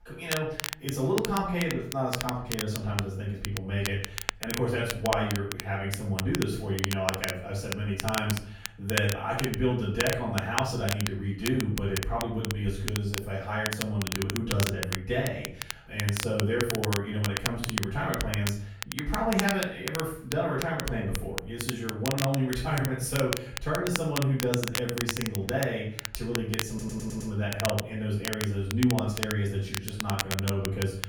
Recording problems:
off-mic speech; far
room echo; noticeable; dies away in 0.6 s
crackle, like an old record; loud; 5 dB below the speech
audio stuttering; at 27 s

